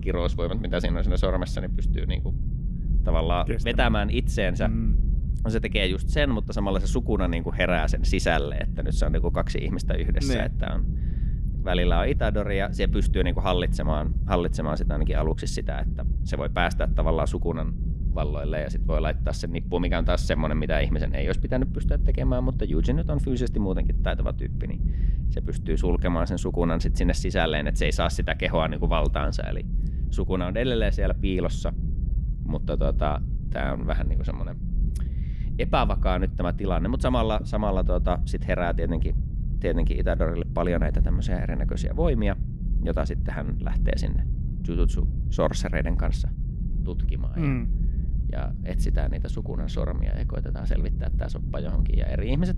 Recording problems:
low rumble; noticeable; throughout; 15 dB below the speech

